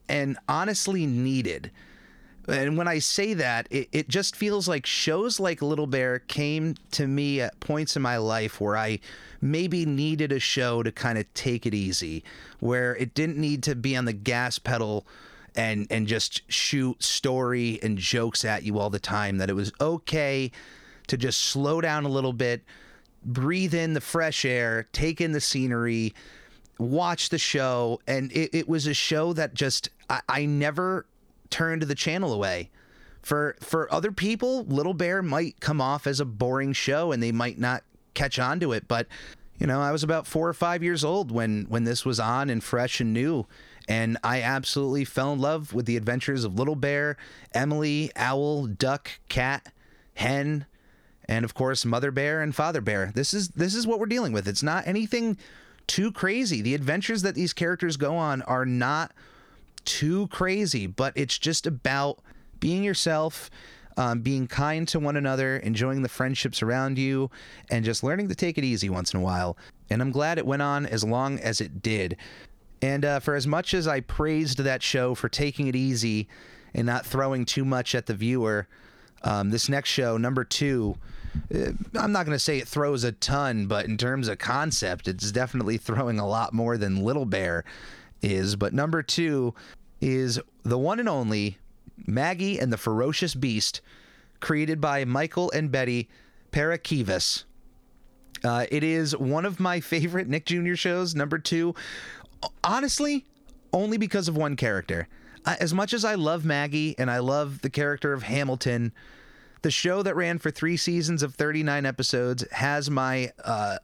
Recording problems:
squashed, flat; somewhat

